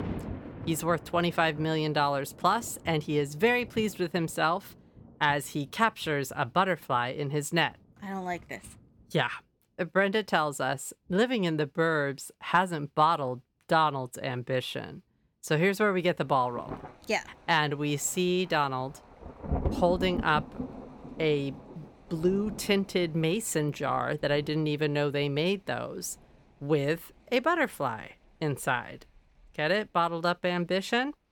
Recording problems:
rain or running water; noticeable; throughout; 15 dB below the speech

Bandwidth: 18.5 kHz